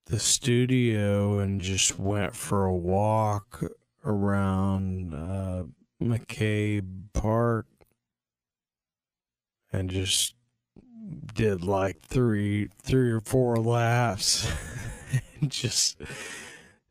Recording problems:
wrong speed, natural pitch; too slow; 0.5 times normal speed

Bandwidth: 15 kHz